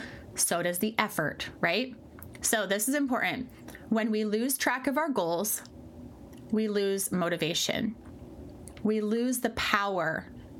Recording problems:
squashed, flat; somewhat

